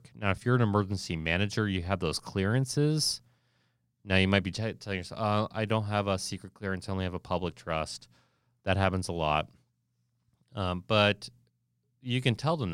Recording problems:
abrupt cut into speech; at the end

